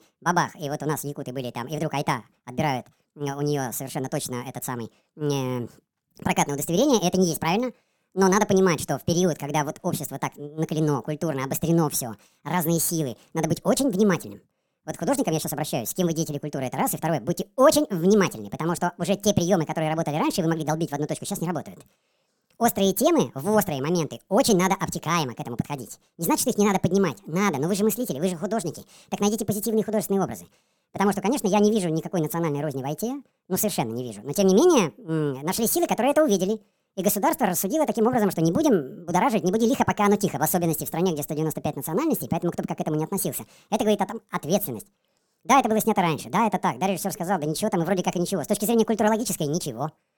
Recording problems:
wrong speed and pitch; too fast and too high; 1.5 times normal speed

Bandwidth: 17.5 kHz